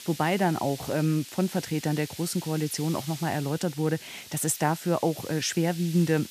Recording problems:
hiss; noticeable; throughout; 15 dB below the speech

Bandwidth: 14.5 kHz